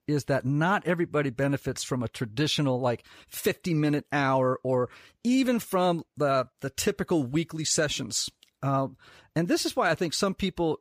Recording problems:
none

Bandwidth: 15 kHz